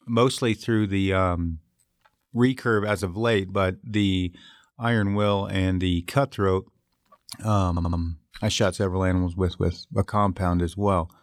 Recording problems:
audio stuttering; at 7.5 s

